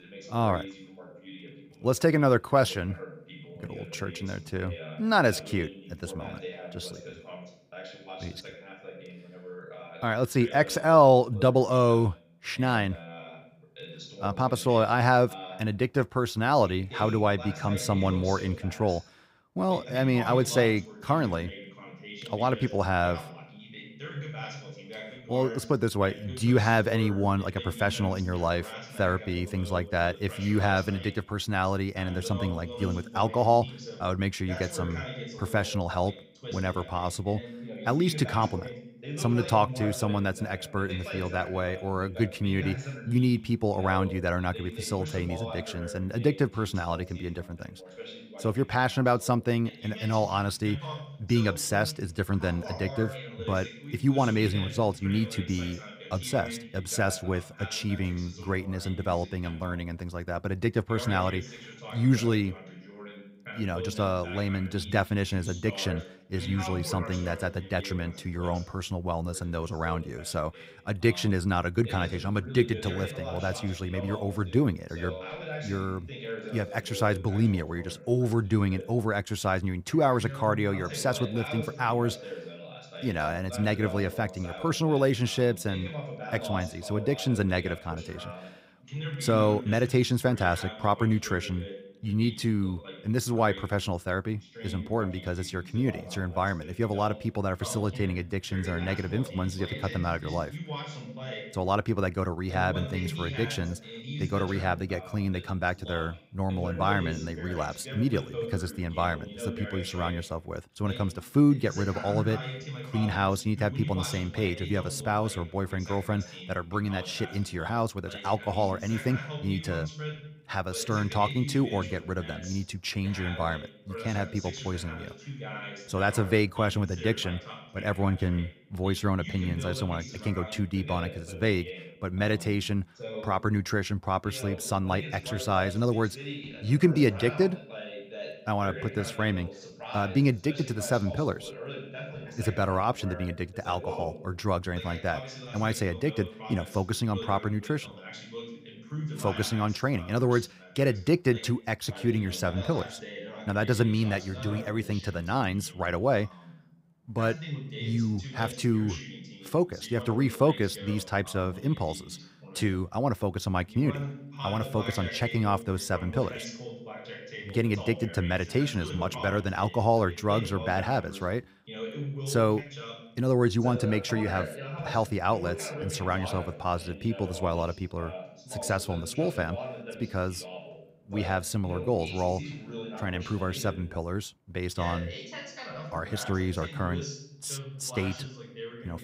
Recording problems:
voice in the background; noticeable; throughout; 10 dB below the speech

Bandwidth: 15.5 kHz